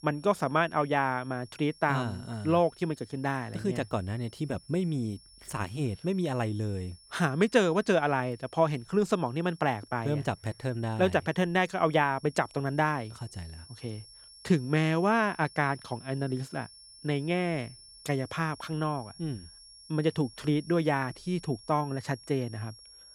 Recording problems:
high-pitched whine; faint; throughout; 5.5 kHz, 20 dB below the speech

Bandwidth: 18.5 kHz